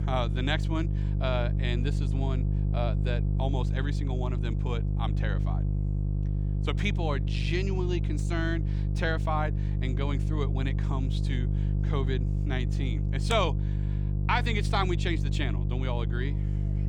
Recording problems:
electrical hum; loud; throughout; 50 Hz, 9 dB below the speech

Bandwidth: 18 kHz